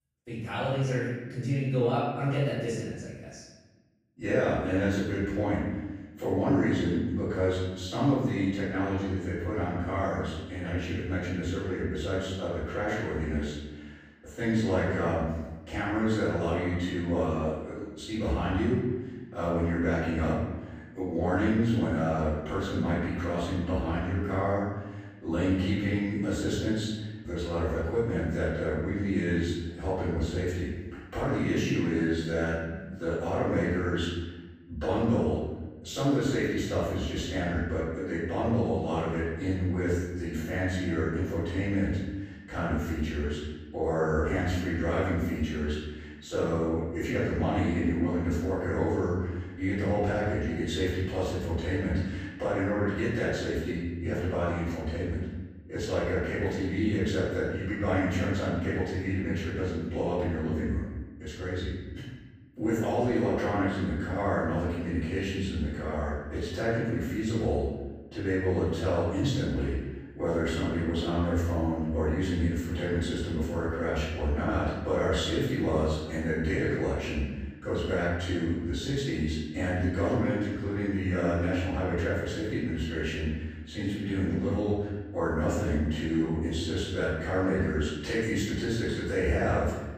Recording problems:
room echo; strong; dies away in 1.1 s
off-mic speech; far

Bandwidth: 15 kHz